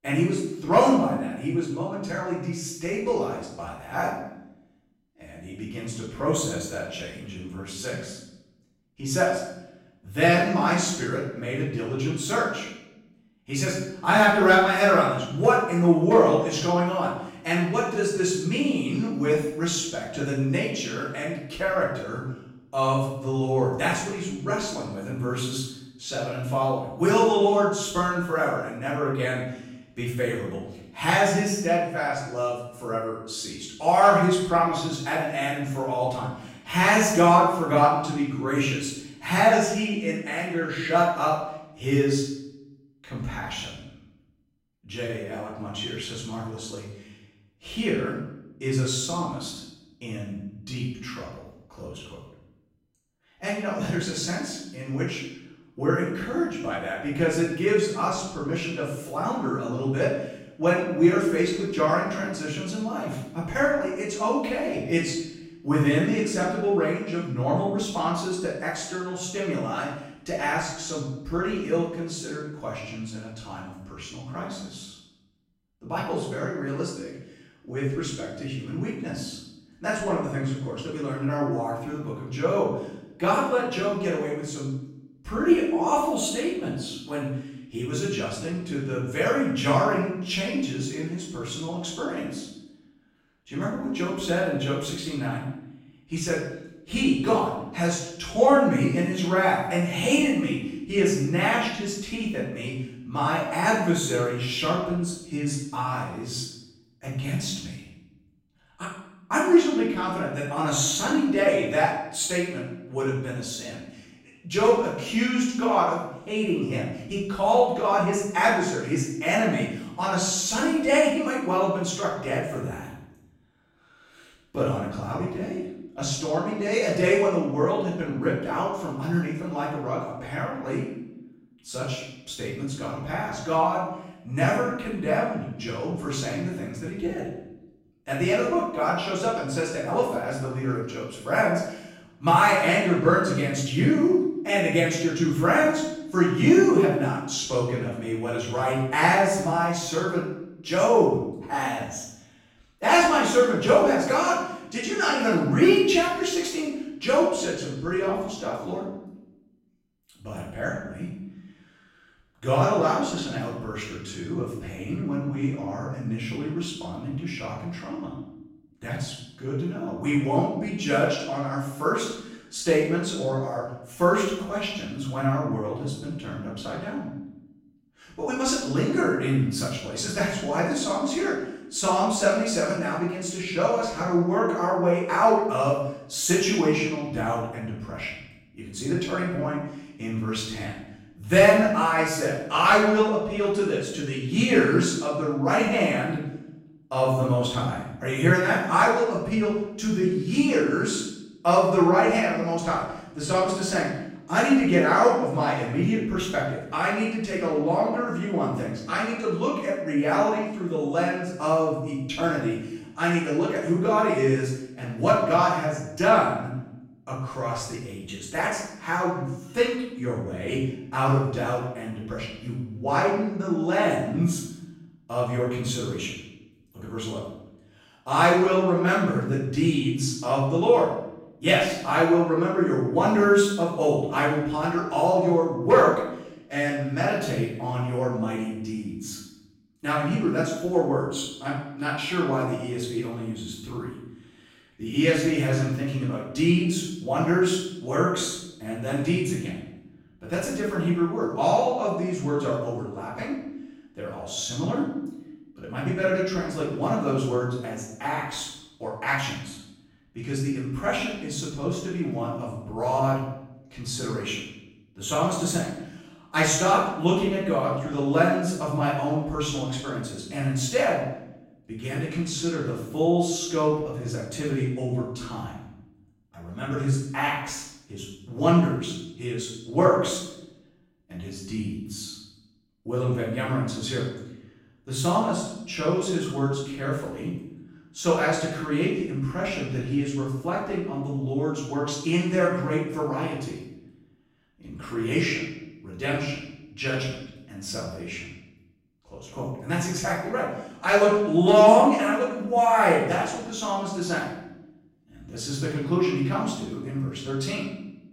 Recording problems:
off-mic speech; far
room echo; noticeable; dies away in 0.8 s

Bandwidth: 16 kHz